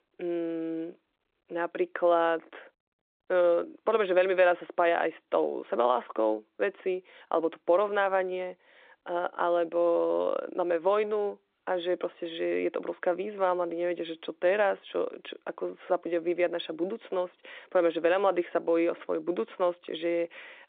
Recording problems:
phone-call audio; nothing above 3.5 kHz

